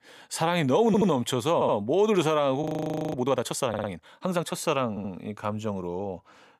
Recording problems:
audio stuttering; 4 times, first at 1 s
audio freezing; at 2.5 s for 0.5 s

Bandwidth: 15.5 kHz